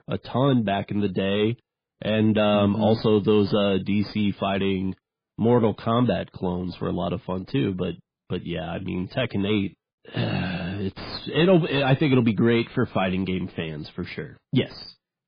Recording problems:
garbled, watery; badly
distortion; slight; 10 dB below the speech

